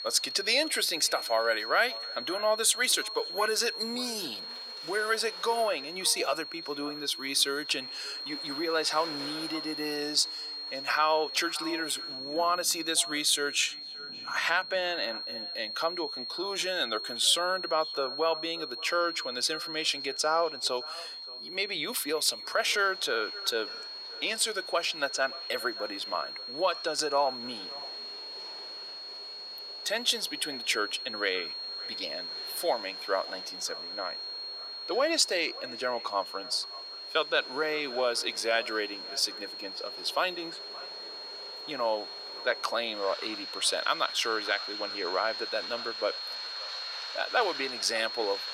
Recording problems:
thin; very; fading below 450 Hz
echo of what is said; faint; throughout; 570 ms later, 20 dB below the speech
high-pitched whine; loud; throughout; 4.5 kHz, 7 dB below the speech
rain or running water; noticeable; throughout; 20 dB below the speech

